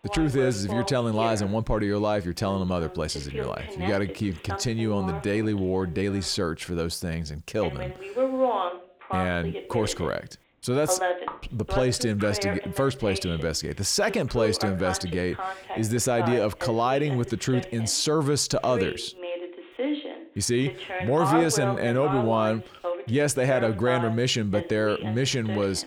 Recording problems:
voice in the background; loud; throughout; 7 dB below the speech

